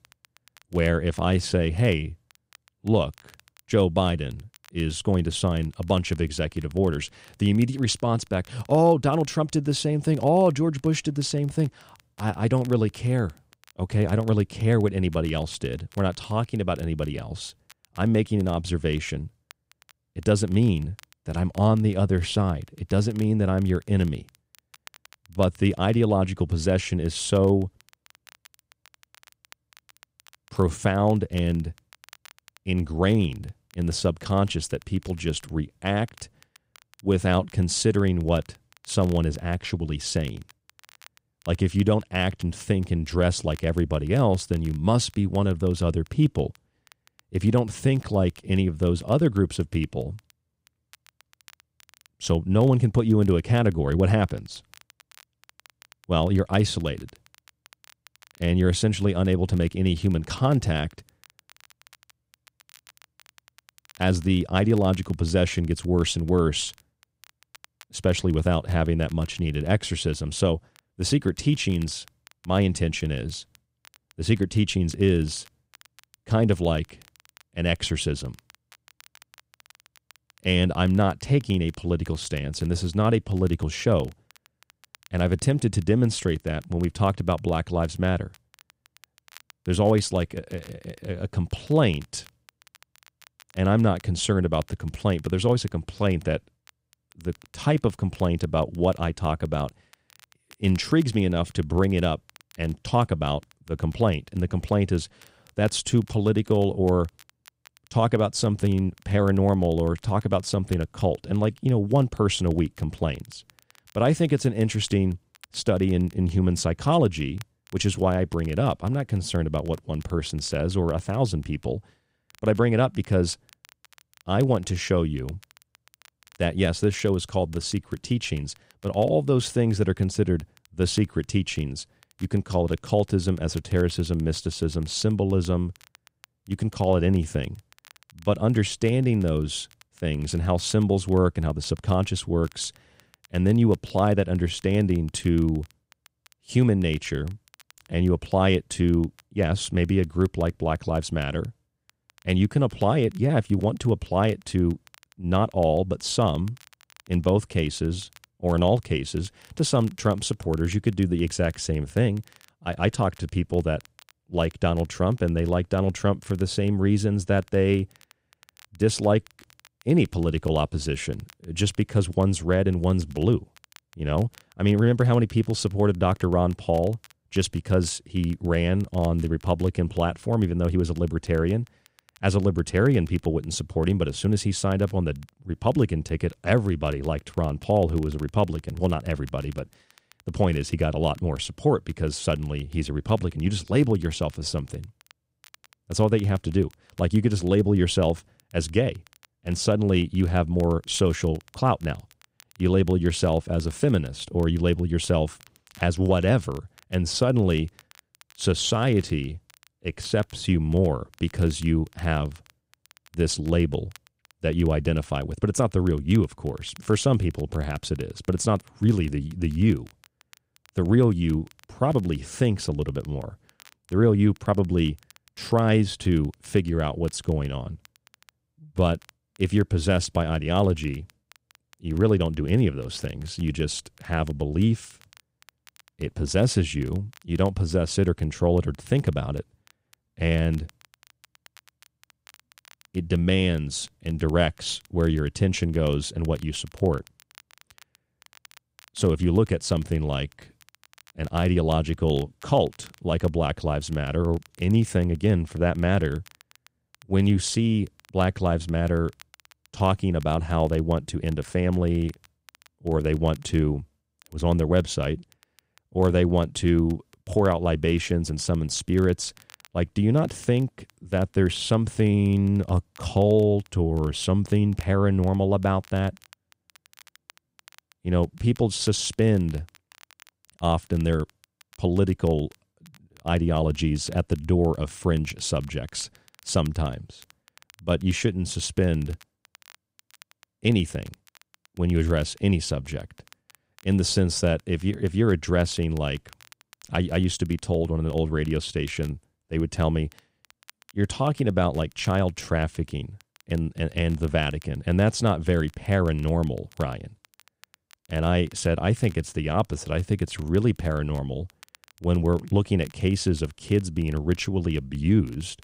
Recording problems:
crackle, like an old record; faint; 30 dB below the speech

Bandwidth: 15.5 kHz